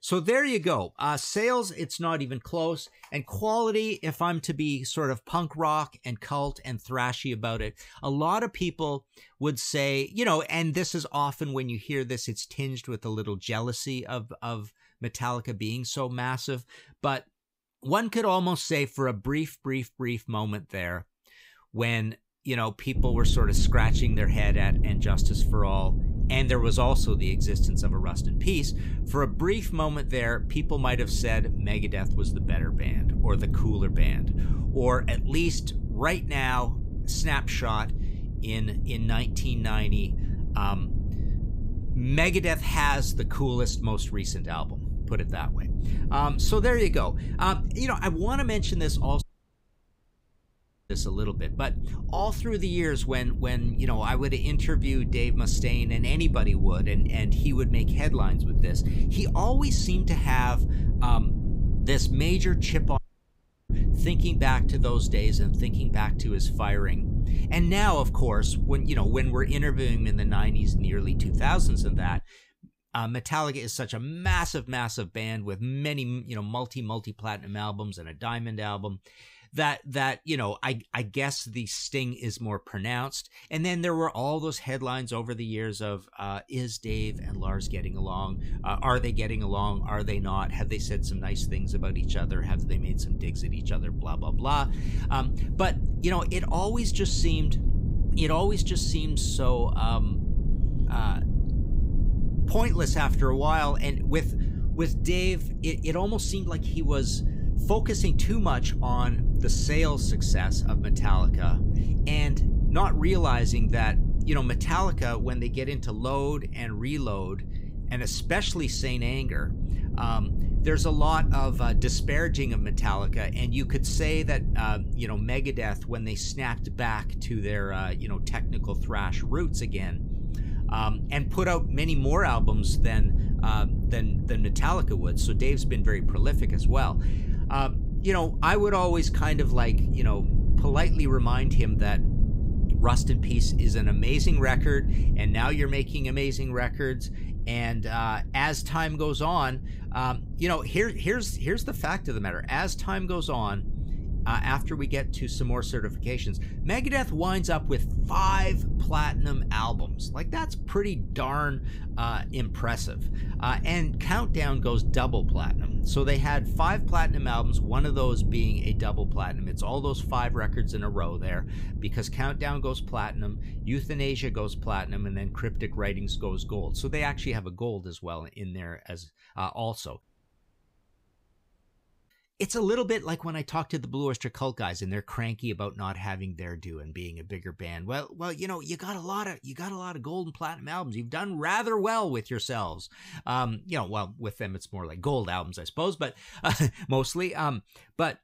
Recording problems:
low rumble; noticeable; from 23 s to 1:12 and from 1:27 to 2:57; 15 dB below the speech
audio cutting out; at 49 s for 1.5 s, at 1:03 for 0.5 s and at 3:00 for 2 s

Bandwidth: 15.5 kHz